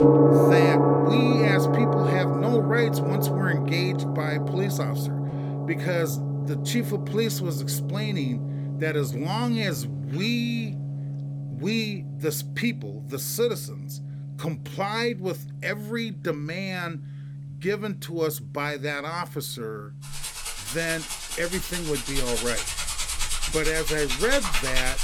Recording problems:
background music; very loud; throughout; 3 dB above the speech

